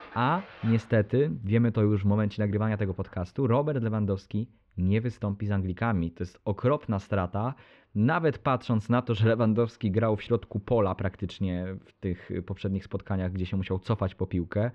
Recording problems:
muffled; slightly; fading above 3.5 kHz
rain or running water; faint; throughout; 25 dB below the speech

